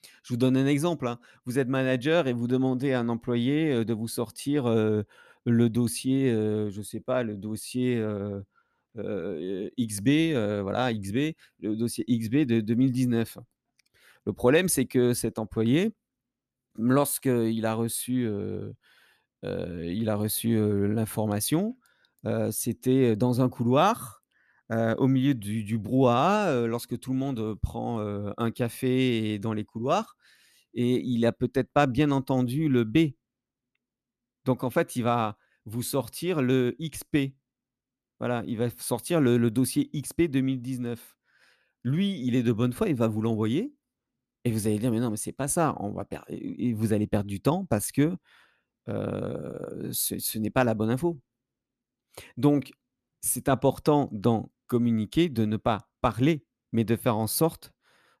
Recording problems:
none

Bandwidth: 14 kHz